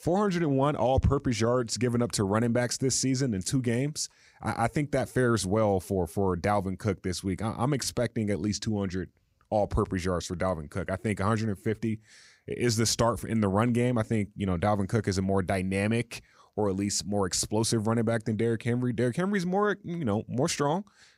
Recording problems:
none

